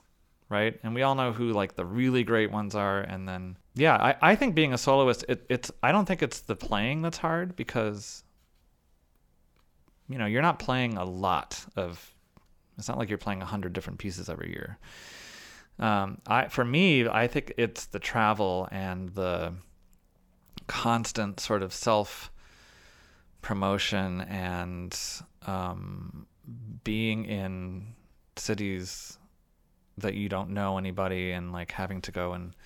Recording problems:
none

